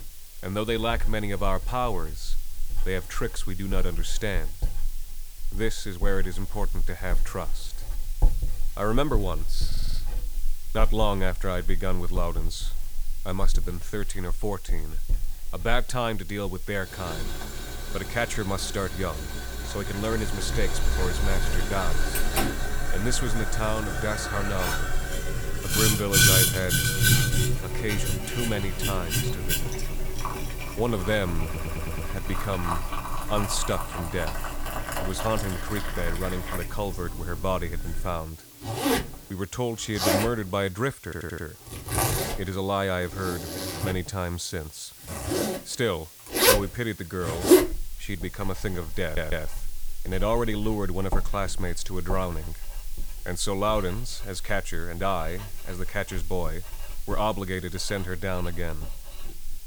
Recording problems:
household noises; very loud; throughout; 2 dB above the speech
hiss; noticeable; throughout; 15 dB below the speech
audio stuttering; 4 times, first at 9.5 s

